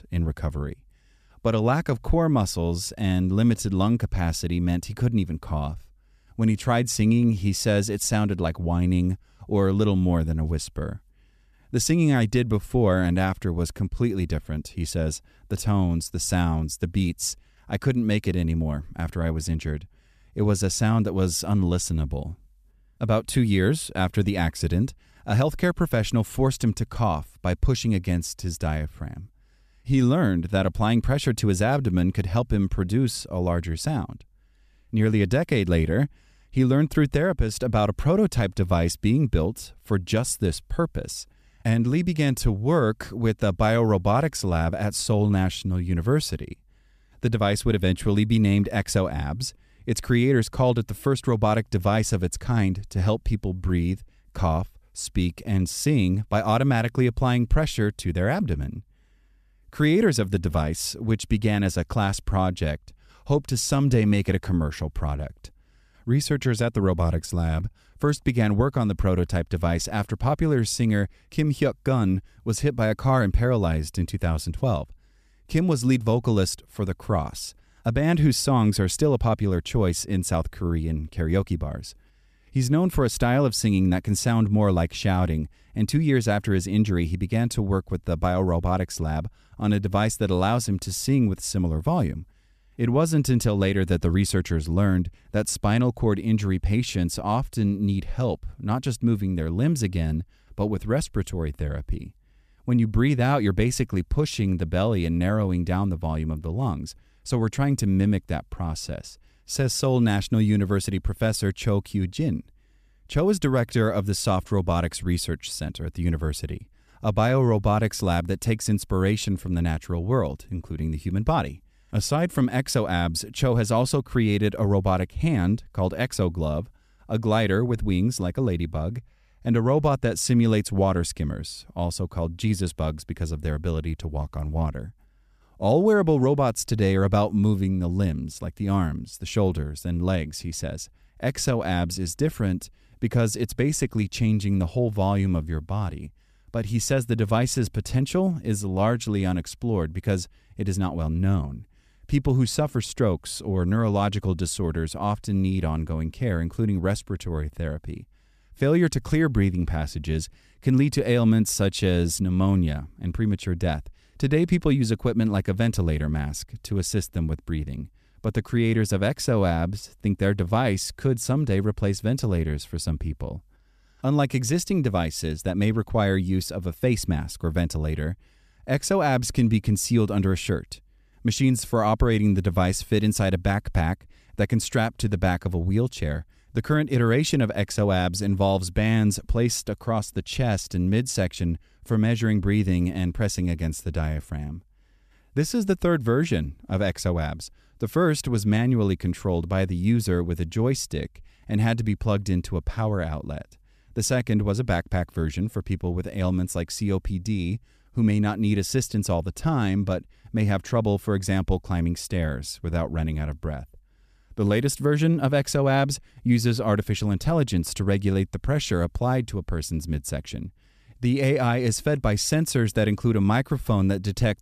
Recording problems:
none

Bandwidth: 14.5 kHz